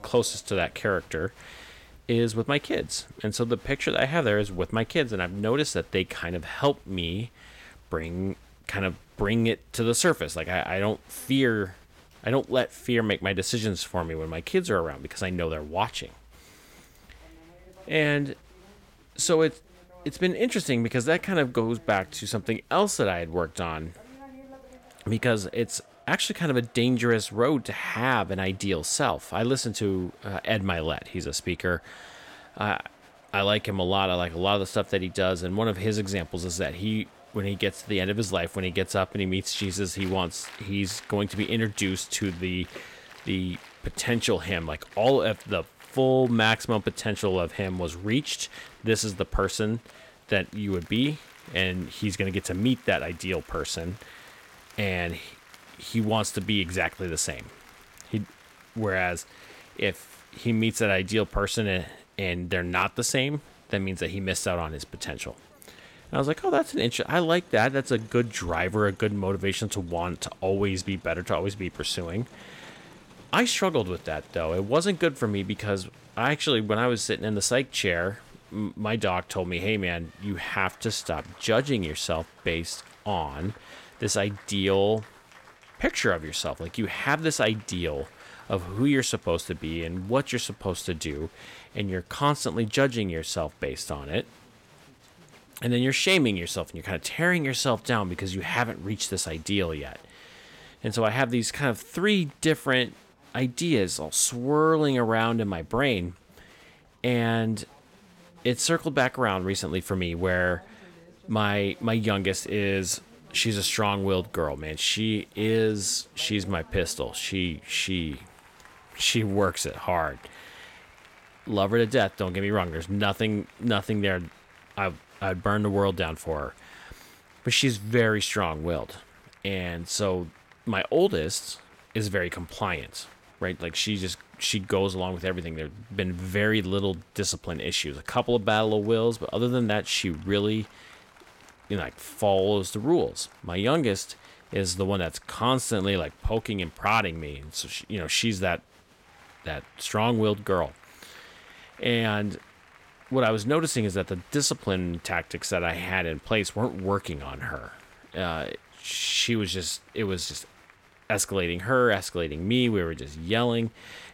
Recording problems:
crowd noise; faint; throughout; 25 dB below the speech

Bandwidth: 16.5 kHz